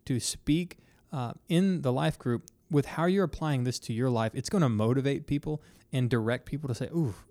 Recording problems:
none

